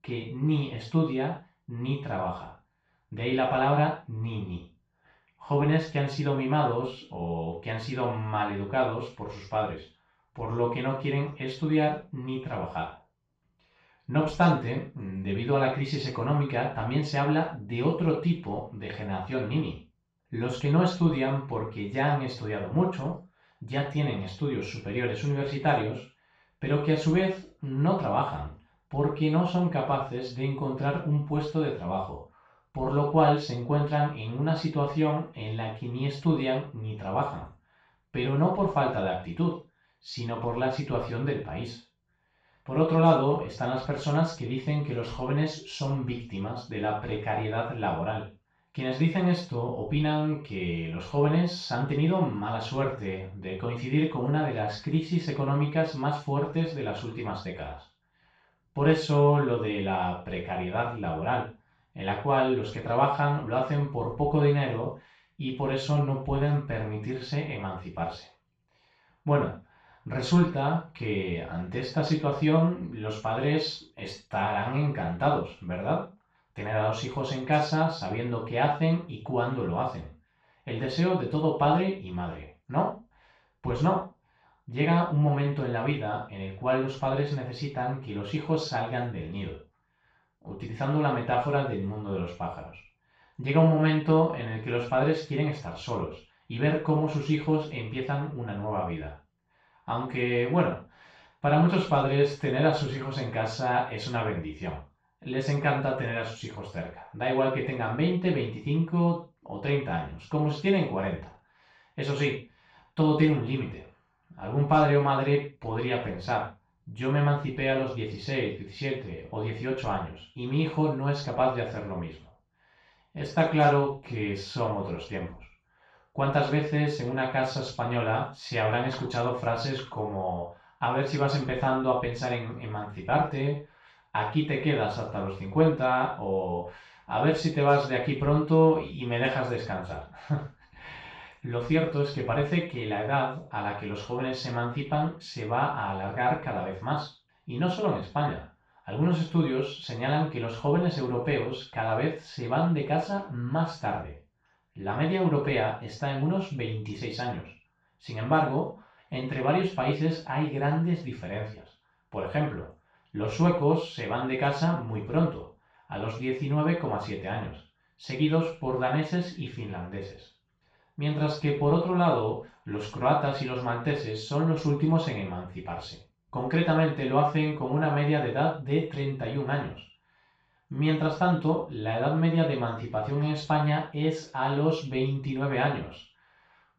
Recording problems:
off-mic speech; far
room echo; noticeable; dies away in 0.3 s

